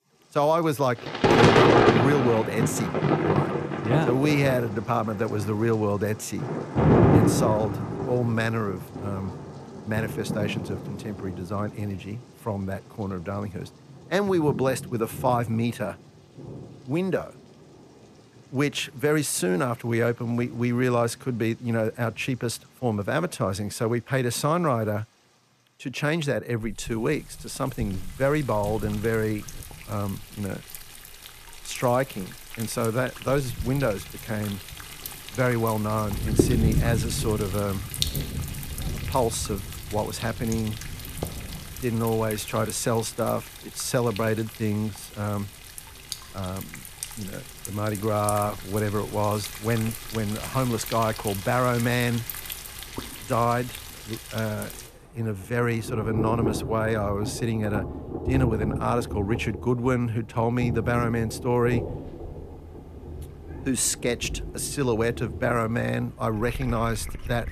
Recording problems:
rain or running water; loud; throughout; 3 dB below the speech

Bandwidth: 14.5 kHz